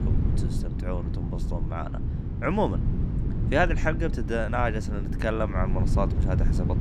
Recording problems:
wind noise on the microphone; occasional gusts; 10 dB below the speech

